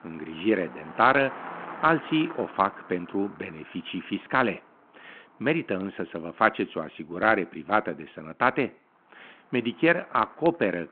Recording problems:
phone-call audio
traffic noise; noticeable; throughout; 20 dB below the speech

